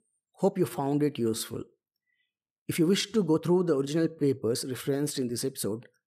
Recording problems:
uneven, jittery; strongly

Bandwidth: 14.5 kHz